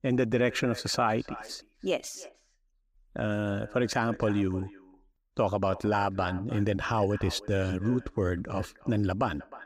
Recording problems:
echo of what is said; faint; throughout; 310 ms later, 20 dB below the speech

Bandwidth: 15.5 kHz